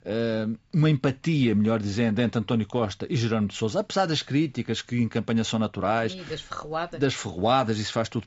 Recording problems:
high frequencies cut off; noticeable; nothing above 8 kHz

